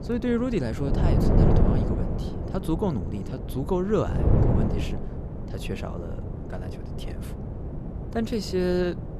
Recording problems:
wind noise on the microphone; heavy; 4 dB below the speech

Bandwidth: 14 kHz